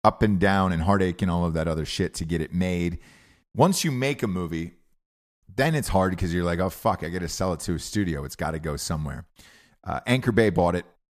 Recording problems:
none

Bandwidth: 14.5 kHz